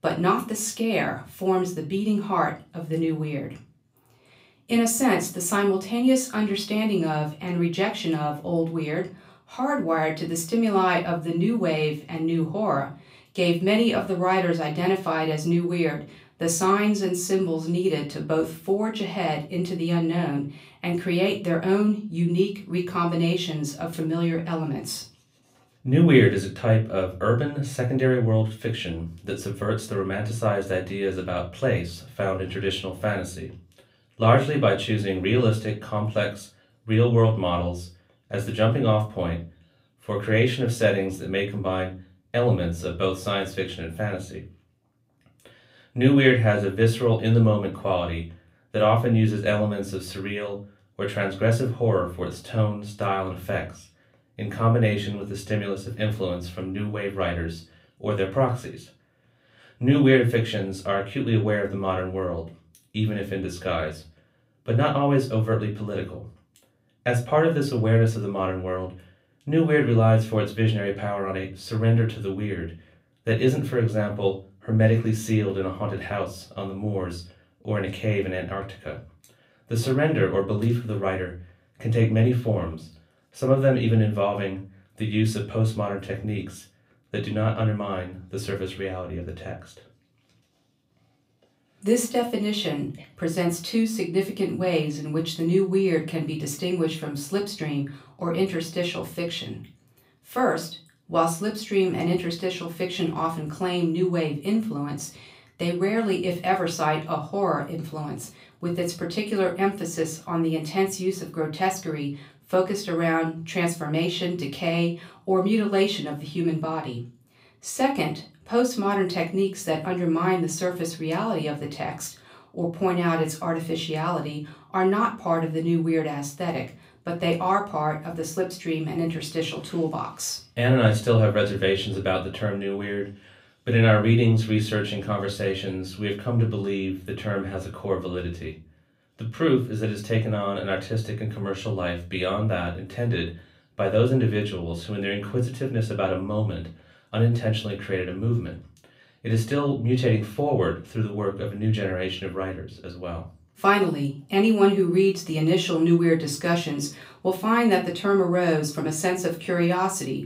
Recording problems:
off-mic speech; far
room echo; very slight; dies away in 0.3 s

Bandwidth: 15.5 kHz